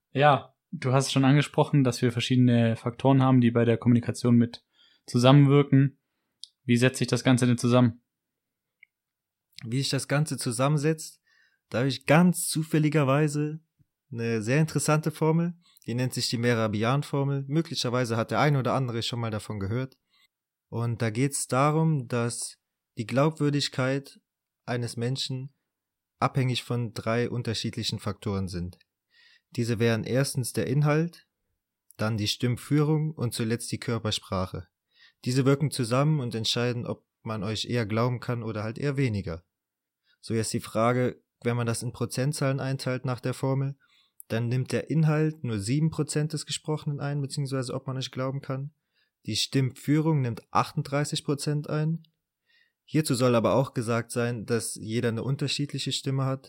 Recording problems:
none

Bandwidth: 16 kHz